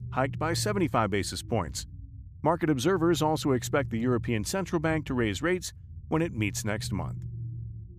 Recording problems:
low rumble; faint; throughout; 25 dB below the speech

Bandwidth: 15 kHz